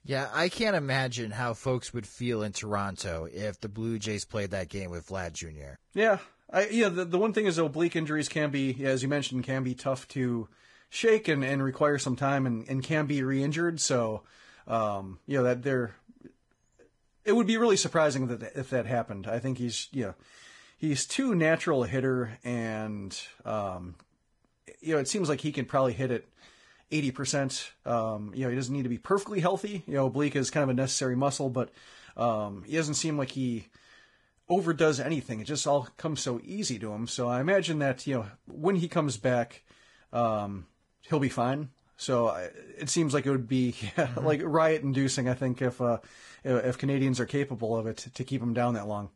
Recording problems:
garbled, watery; badly

